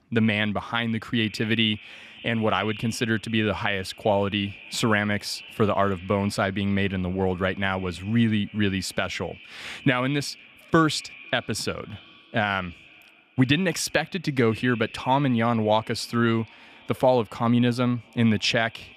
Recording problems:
echo of what is said; faint; throughout; 500 ms later, 20 dB below the speech

